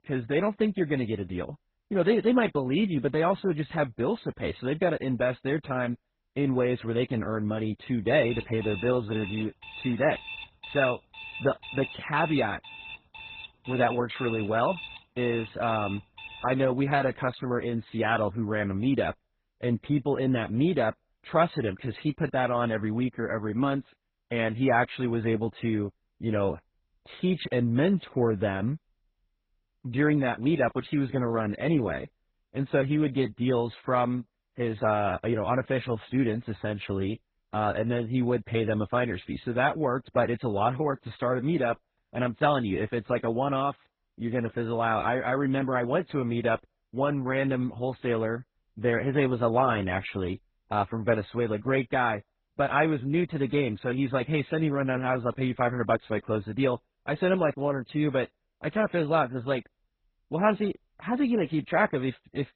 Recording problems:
garbled, watery; badly; nothing above 4 kHz
alarm; faint; from 8 to 17 s; peak 10 dB below the speech

